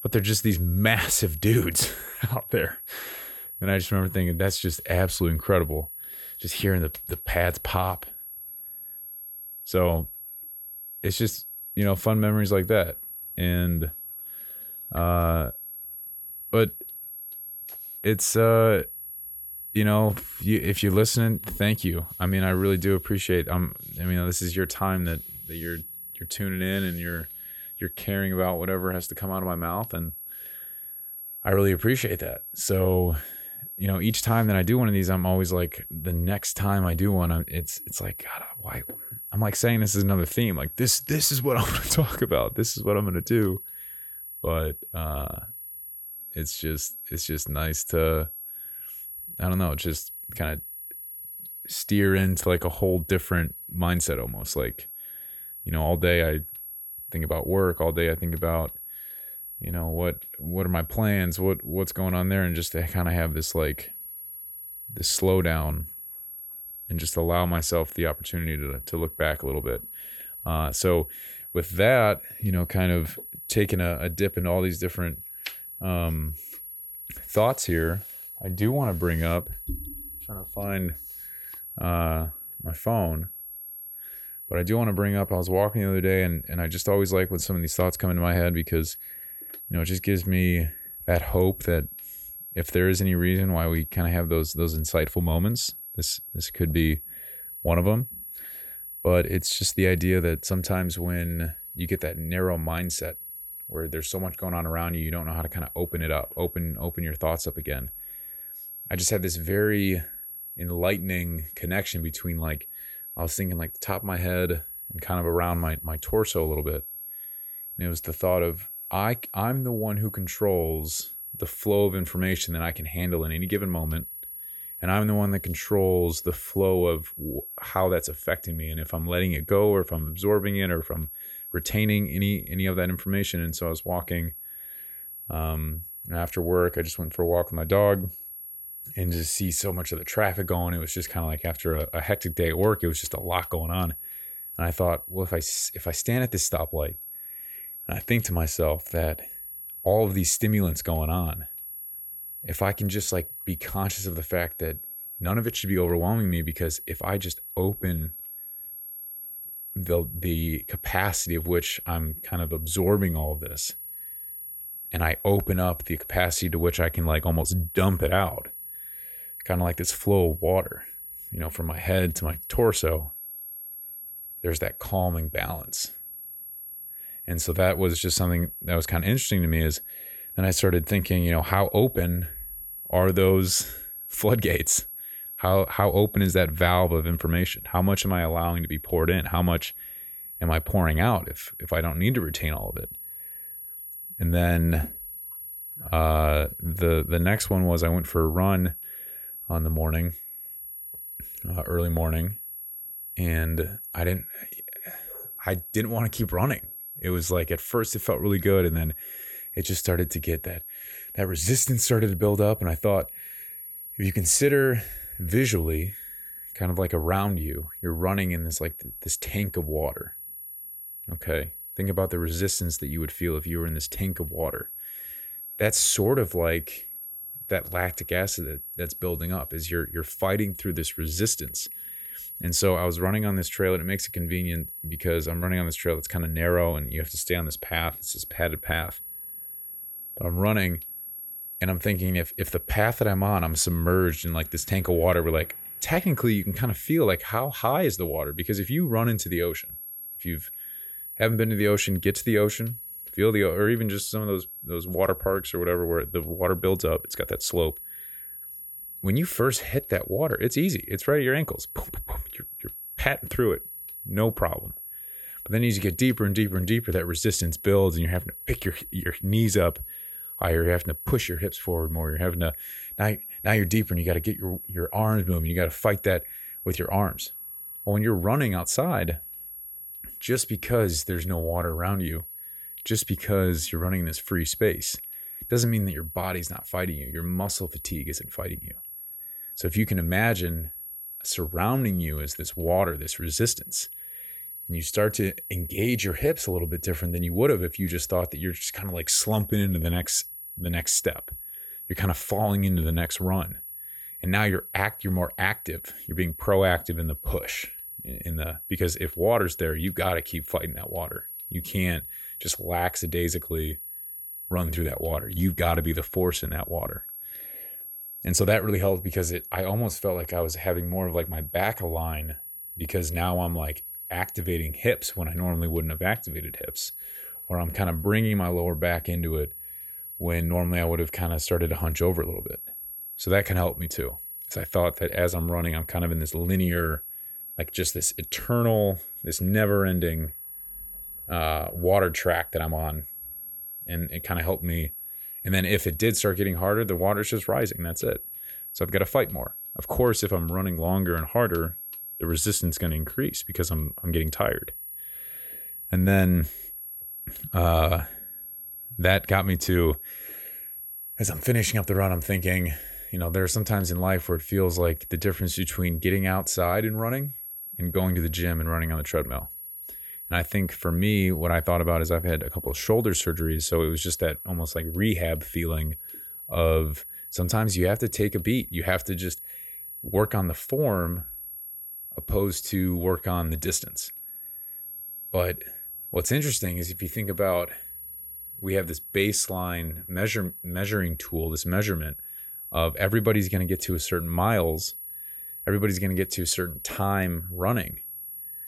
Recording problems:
high-pitched whine; loud; throughout; 11.5 kHz, 10 dB below the speech

